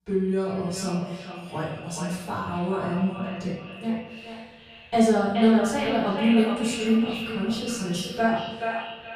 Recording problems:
echo of what is said; strong; throughout; 430 ms later, 8 dB below the speech
off-mic speech; far
room echo; noticeable; dies away in 0.8 s

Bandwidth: 15 kHz